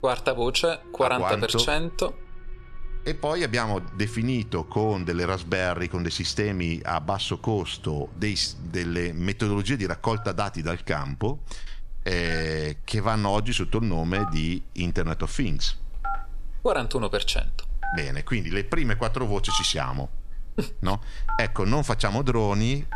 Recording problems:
alarms or sirens; noticeable; throughout; 15 dB below the speech

